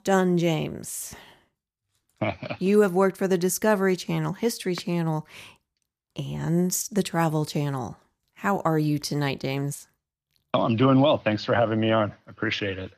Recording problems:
none

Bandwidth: 14.5 kHz